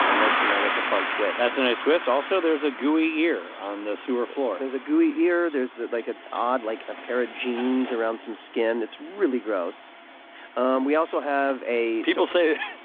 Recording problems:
phone-call audio; nothing above 3.5 kHz
traffic noise; loud; throughout; 3 dB below the speech

